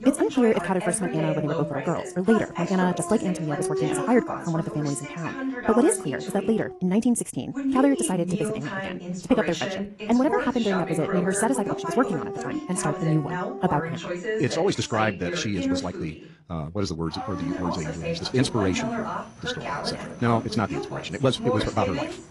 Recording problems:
wrong speed, natural pitch; too fast; 1.7 times normal speed
garbled, watery; slightly
voice in the background; loud; throughout; 6 dB below the speech
animal sounds; noticeable; throughout; 10 dB below the speech
uneven, jittery; slightly; from 2.5 to 20 s

